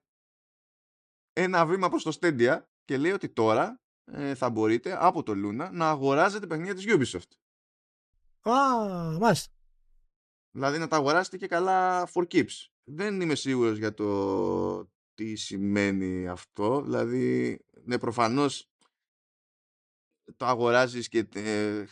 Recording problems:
none

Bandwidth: 13 kHz